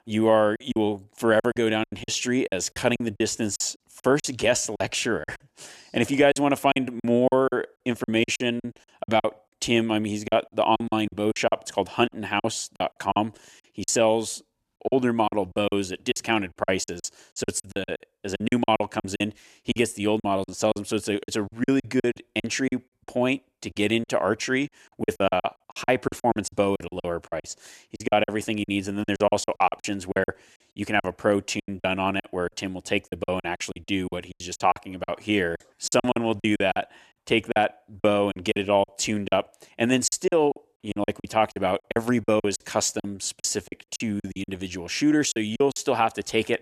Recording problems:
choppy; very; 15% of the speech affected

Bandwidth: 14 kHz